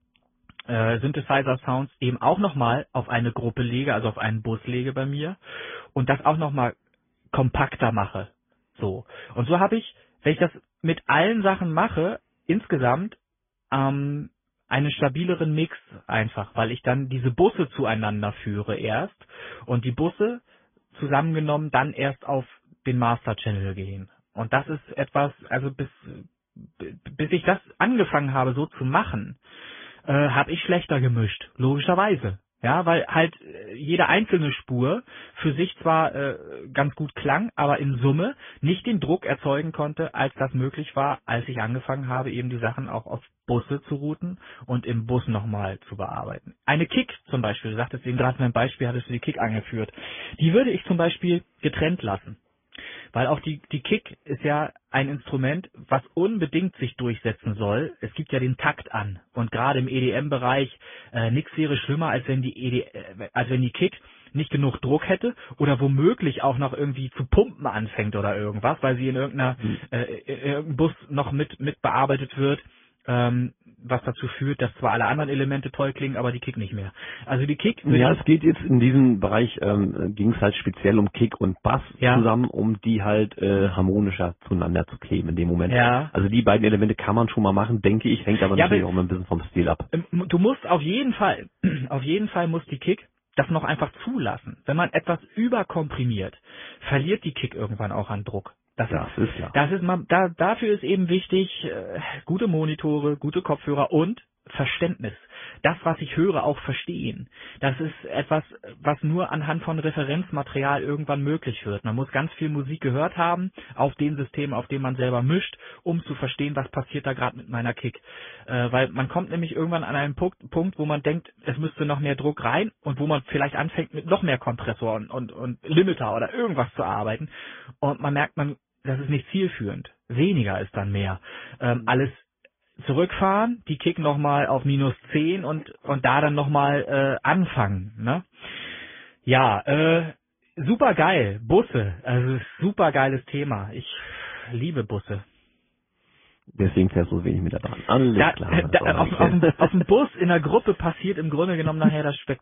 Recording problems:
high frequencies cut off; severe; nothing above 3.5 kHz
garbled, watery; slightly

